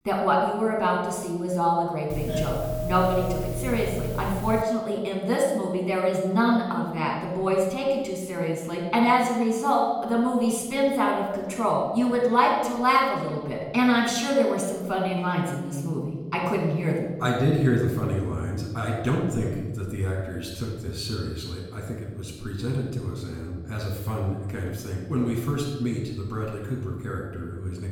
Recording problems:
off-mic speech; far
room echo; noticeable; dies away in 1.4 s
doorbell; noticeable; from 2 to 4.5 s; peak 4 dB below the speech

